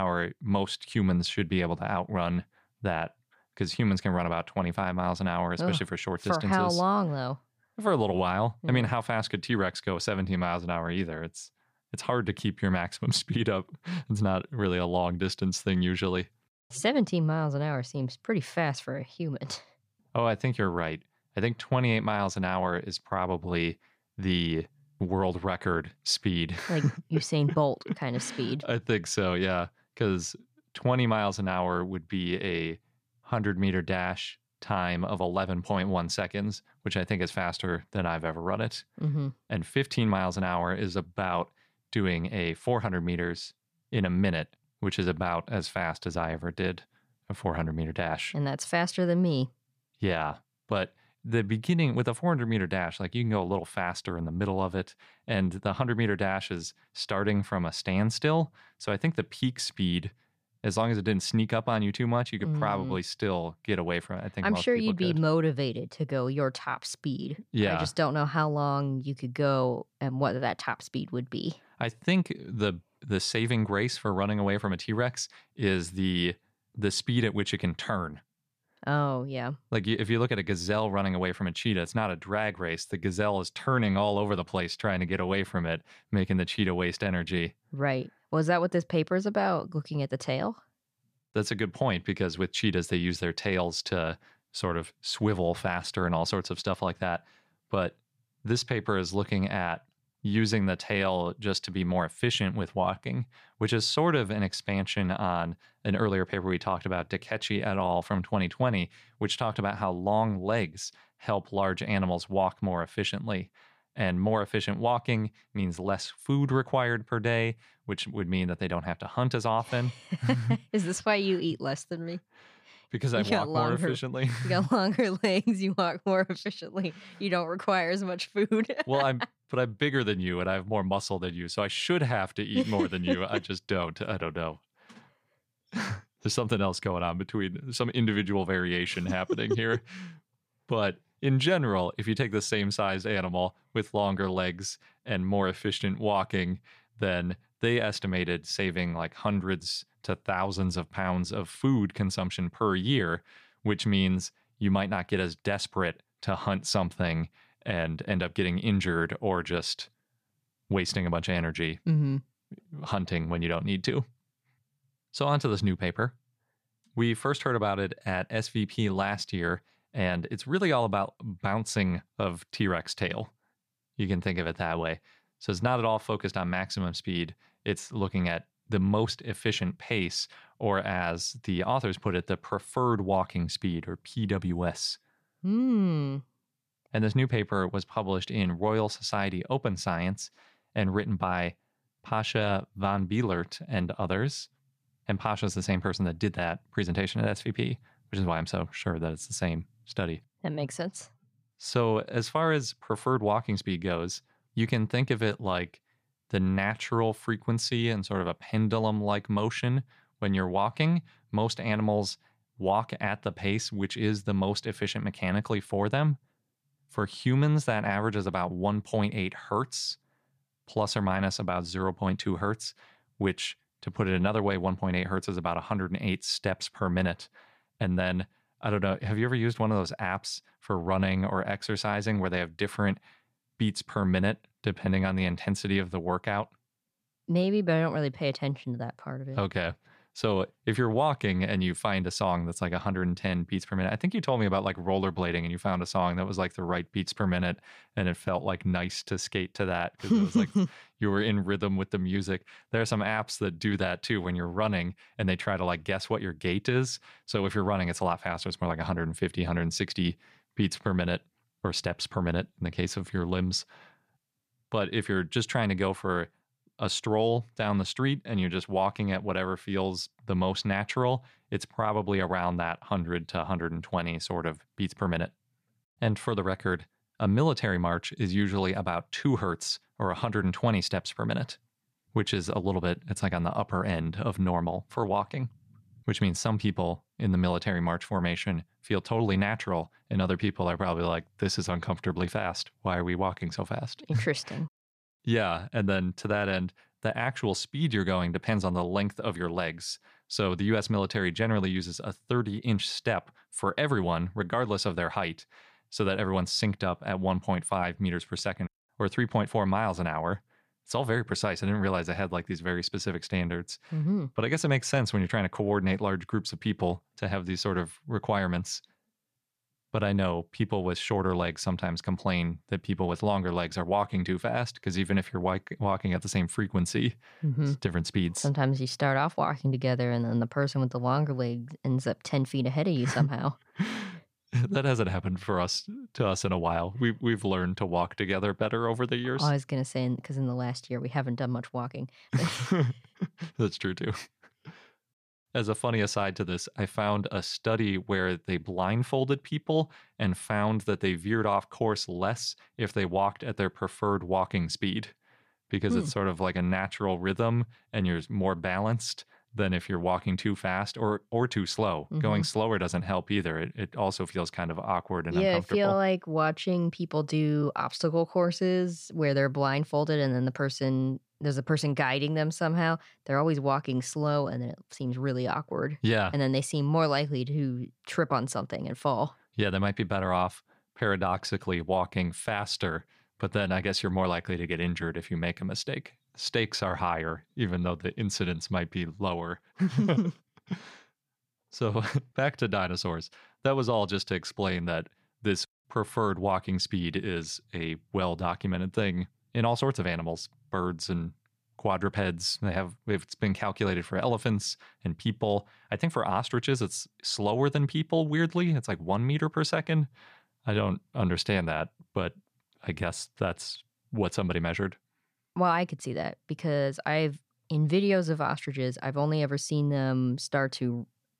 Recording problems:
abrupt cut into speech; at the start

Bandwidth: 14.5 kHz